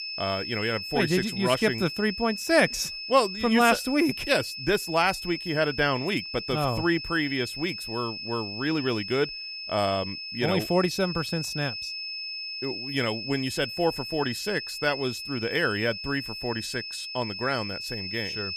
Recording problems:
high-pitched whine; loud; throughout; 5 kHz, 7 dB below the speech

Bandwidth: 14.5 kHz